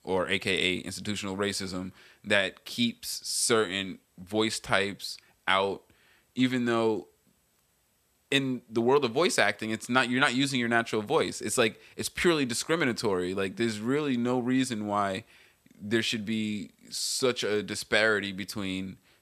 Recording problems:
none

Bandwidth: 14.5 kHz